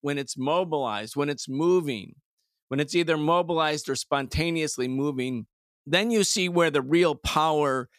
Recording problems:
none

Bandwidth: 14.5 kHz